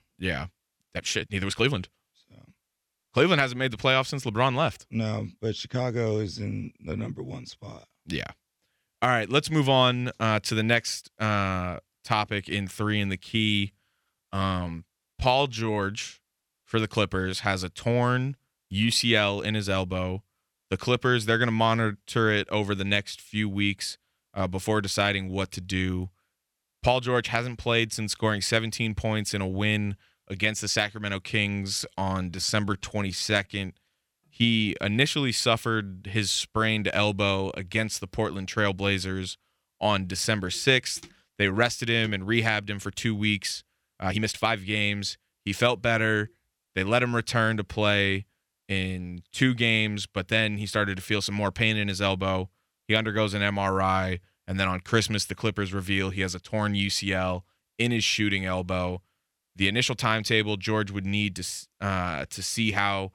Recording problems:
uneven, jittery; strongly; from 1 to 45 s

